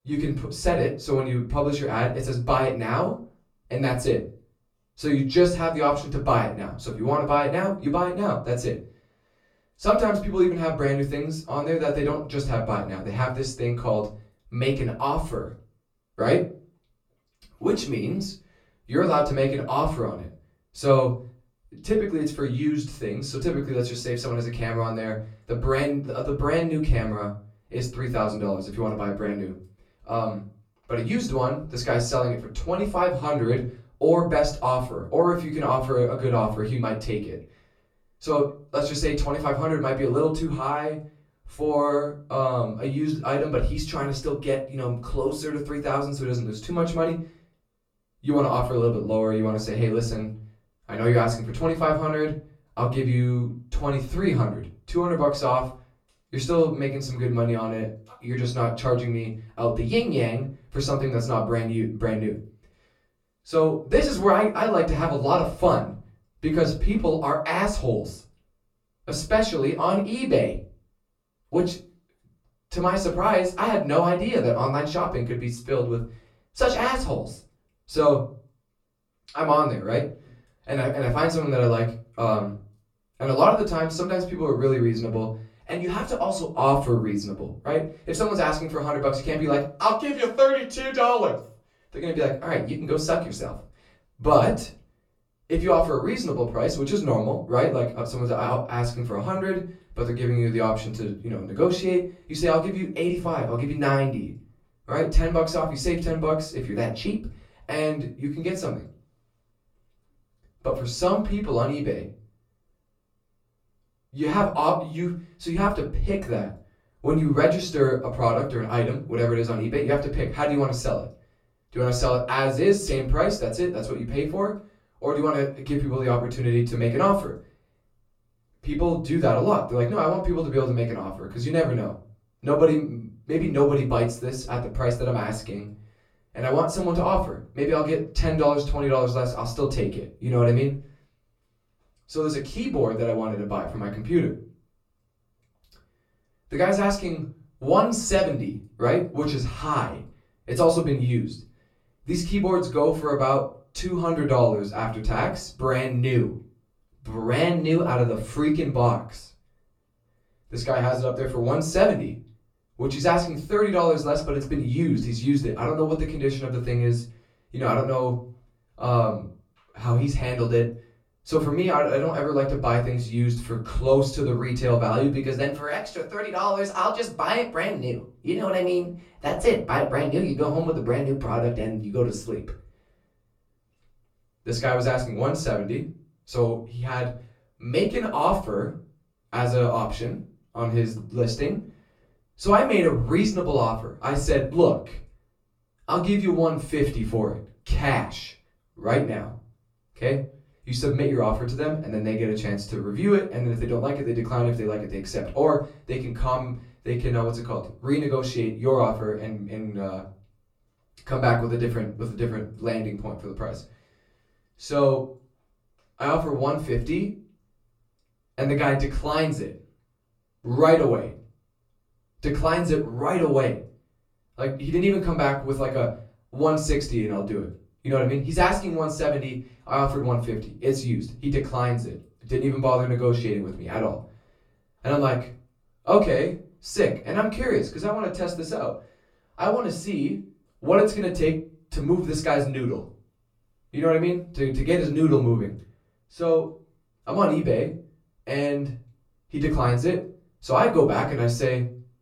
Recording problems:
off-mic speech; far
room echo; slight; dies away in 0.3 s

